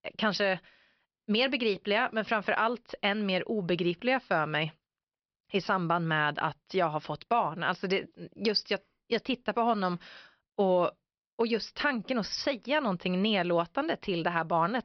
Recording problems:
high frequencies cut off; noticeable; nothing above 5.5 kHz

